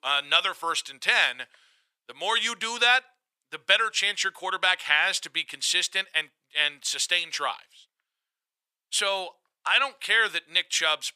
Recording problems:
thin; very; fading below 650 Hz

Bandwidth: 15 kHz